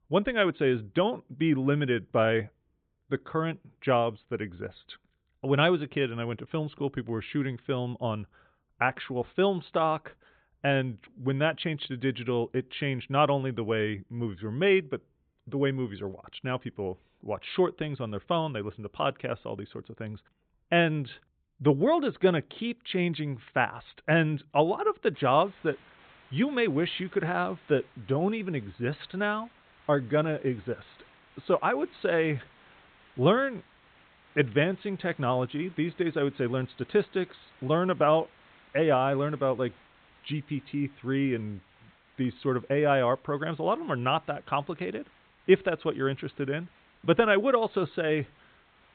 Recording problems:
high frequencies cut off; severe; nothing above 4 kHz
hiss; faint; from 25 s on; 30 dB below the speech

